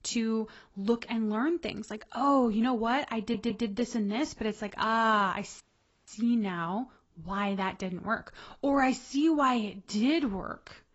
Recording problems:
garbled, watery; badly; nothing above 8 kHz
audio stuttering; at 3 s
audio cutting out; at 5.5 s

